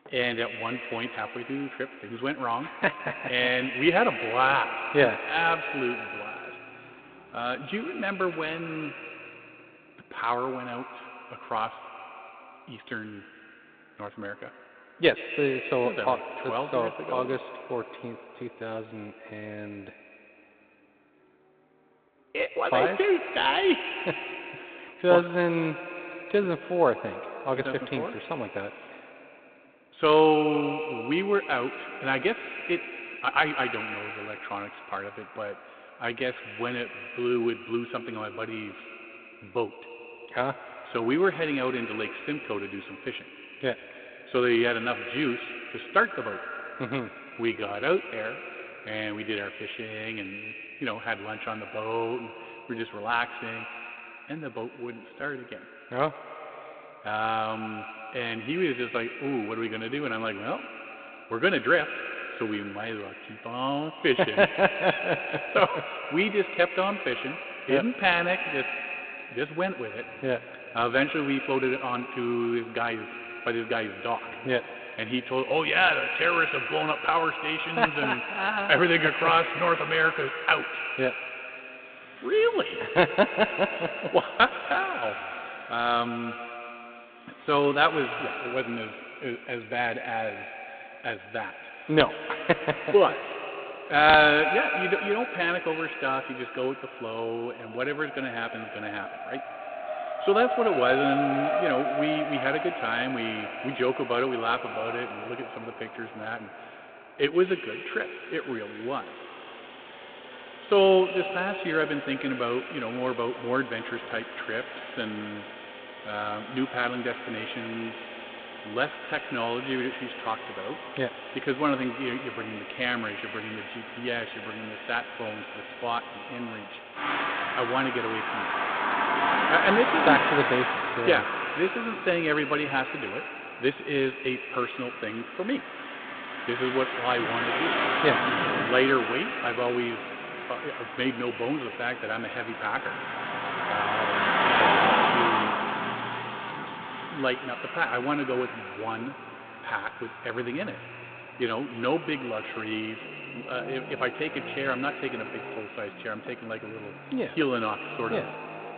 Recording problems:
echo of what is said; strong; throughout; 120 ms later, 9 dB below the speech
phone-call audio; nothing above 3.5 kHz
traffic noise; loud; throughout; 4 dB below the speech
uneven, jittery; strongly; from 3 s to 1:39

